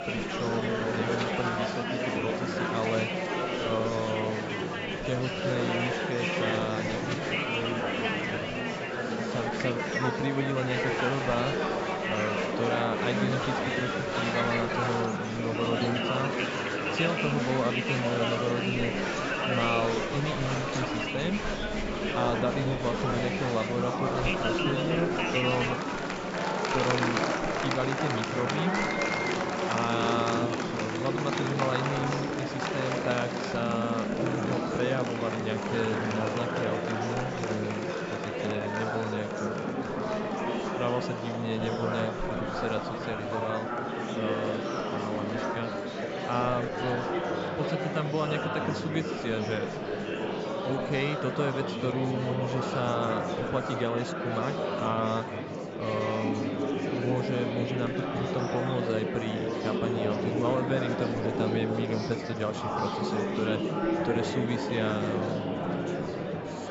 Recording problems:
high frequencies cut off; noticeable; nothing above 8 kHz
murmuring crowd; very loud; throughout; 2 dB above the speech

